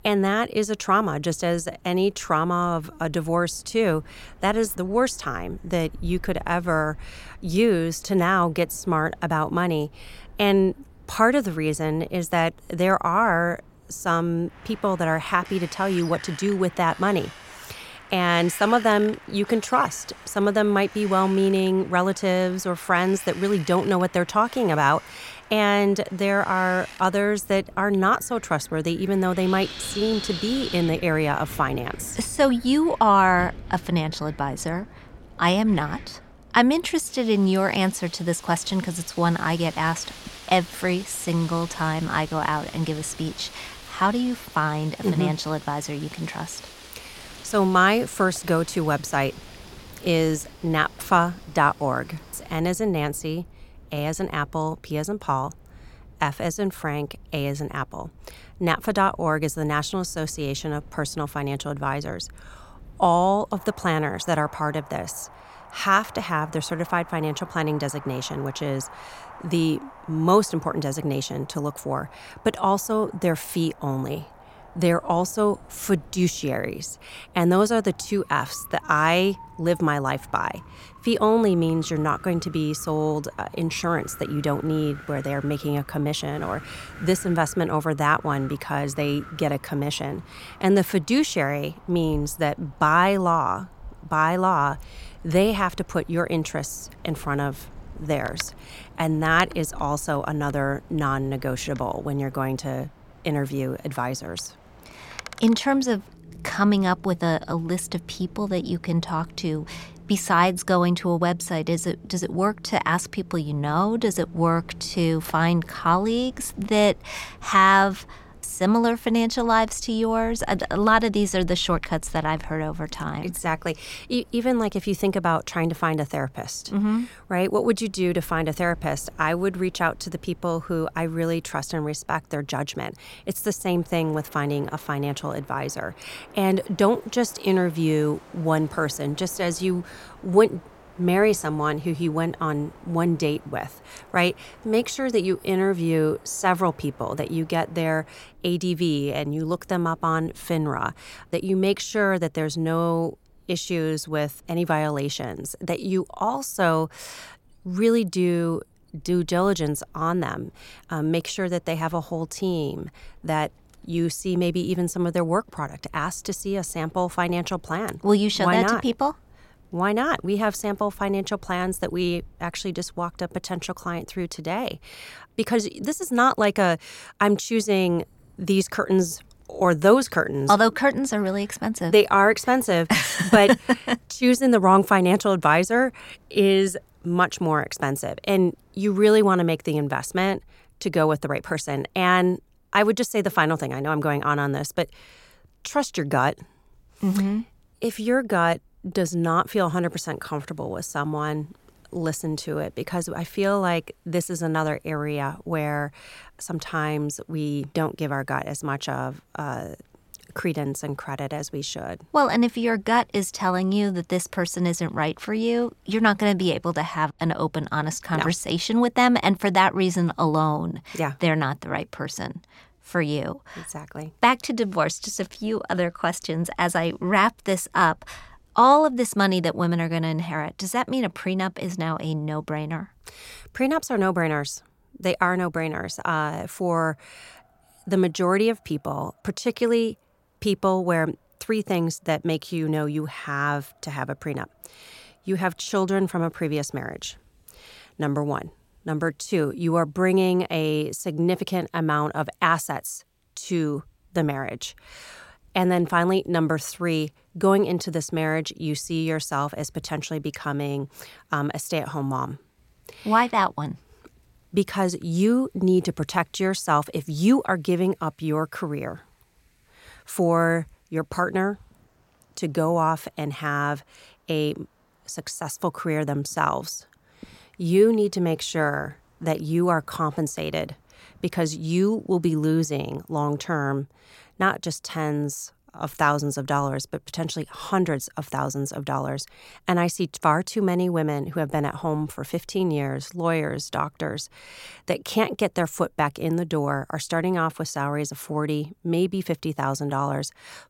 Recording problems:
wind in the background; faint; throughout; 20 dB below the speech

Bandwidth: 16.5 kHz